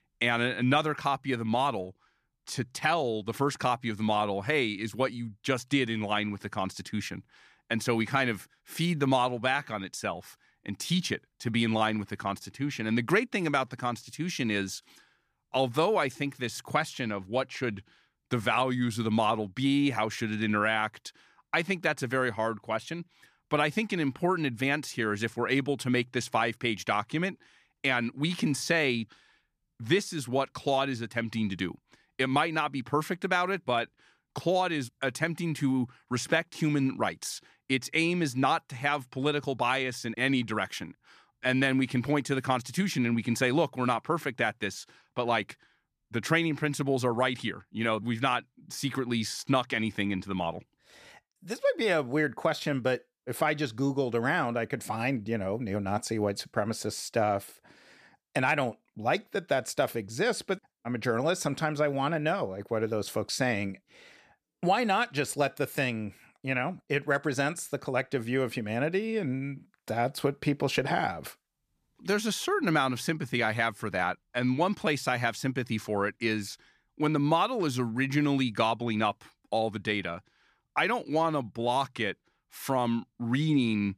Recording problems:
none

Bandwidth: 14.5 kHz